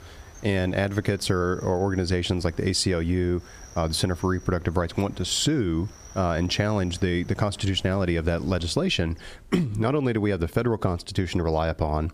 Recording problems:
squashed, flat; somewhat
animal sounds; faint; until 9.5 s; 25 dB below the speech

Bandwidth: 15 kHz